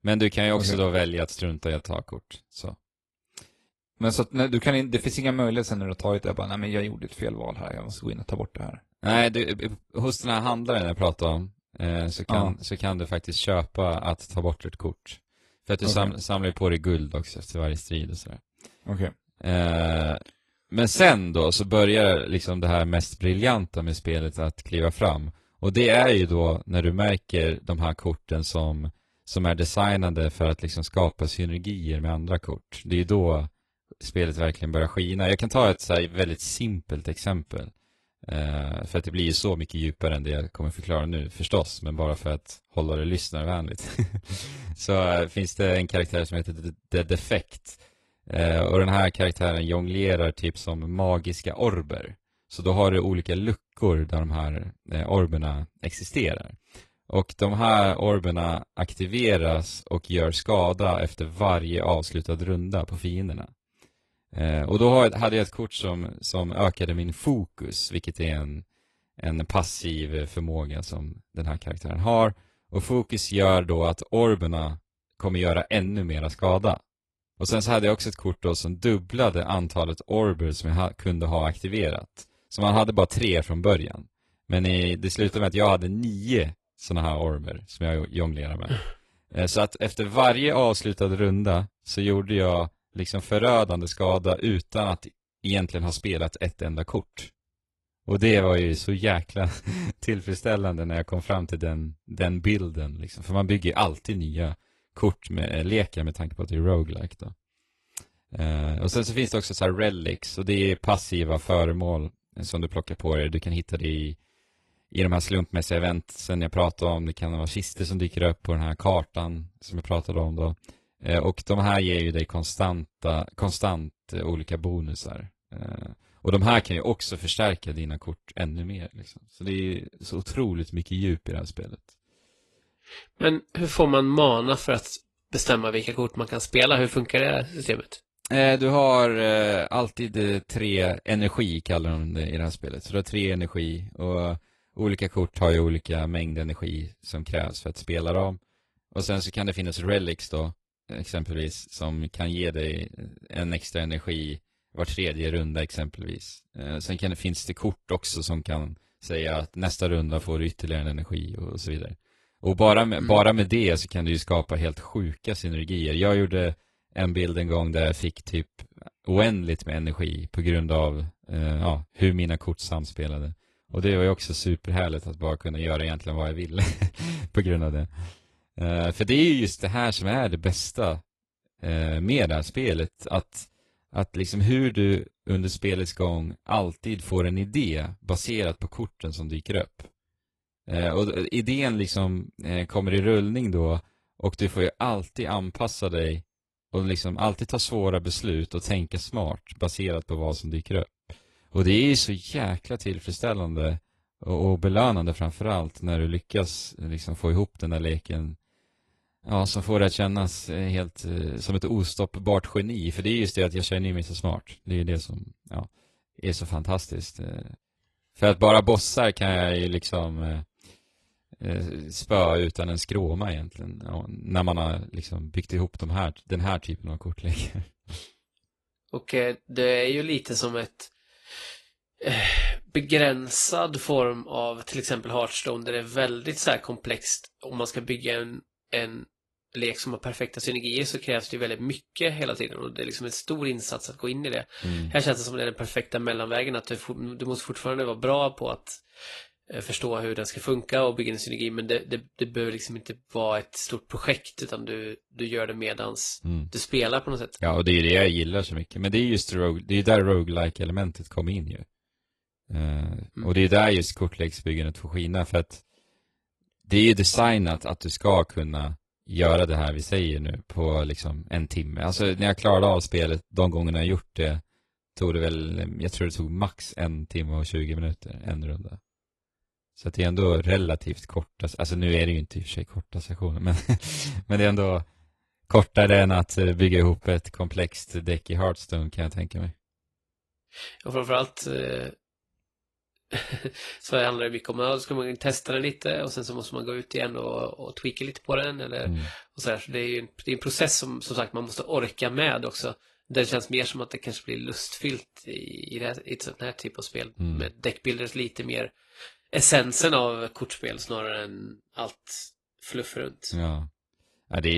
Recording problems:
garbled, watery; slightly; nothing above 11.5 kHz
abrupt cut into speech; at the end

